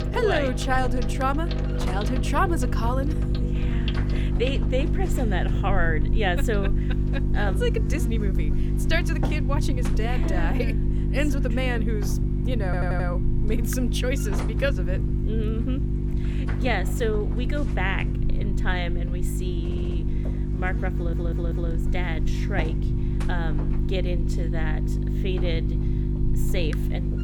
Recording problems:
electrical hum; loud; throughout; 50 Hz, 7 dB below the speech
household noises; noticeable; throughout; 10 dB below the speech
audio stuttering; at 13 s, at 20 s and at 21 s

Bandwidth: 18 kHz